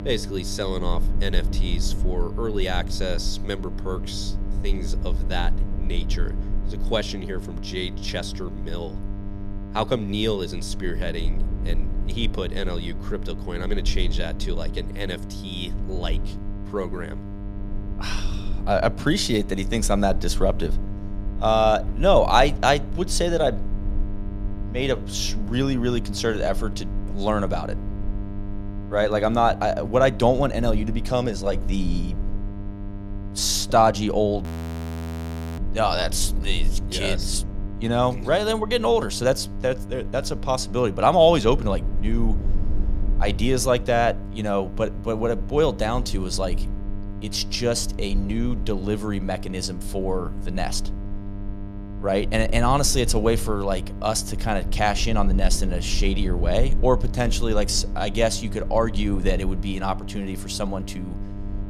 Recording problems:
electrical hum; noticeable; throughout; 50 Hz, 20 dB below the speech
low rumble; faint; throughout; 25 dB below the speech
audio freezing; at 34 s for 1 s

